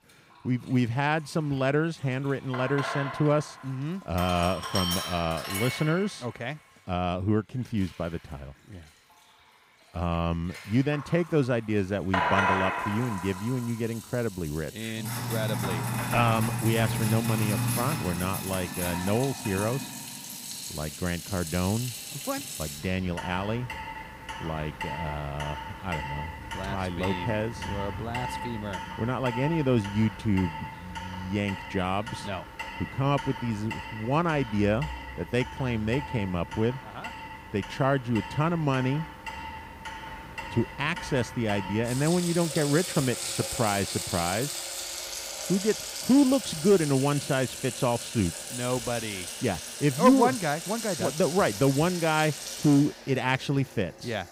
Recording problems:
household noises; loud; throughout; 6 dB below the speech

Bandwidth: 15.5 kHz